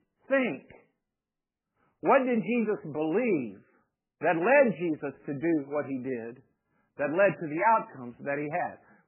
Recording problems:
garbled, watery; badly; nothing above 2.5 kHz

